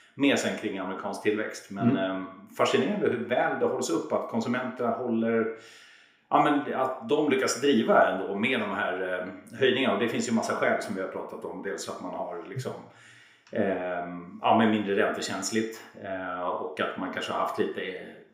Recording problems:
room echo; slight; dies away in 0.6 s
off-mic speech; somewhat distant

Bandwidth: 15.5 kHz